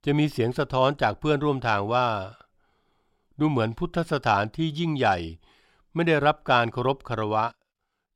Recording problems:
none

